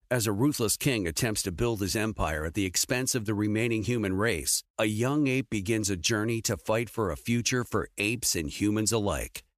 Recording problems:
none

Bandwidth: 14.5 kHz